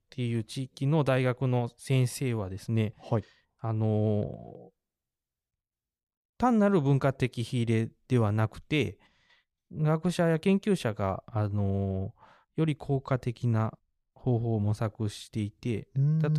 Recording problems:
abrupt cut into speech; at the end

